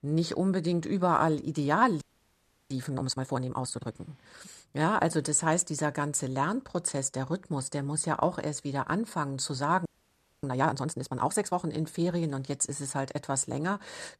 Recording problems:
audio freezing; at 2 s for 0.5 s and at 10 s for 0.5 s

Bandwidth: 13.5 kHz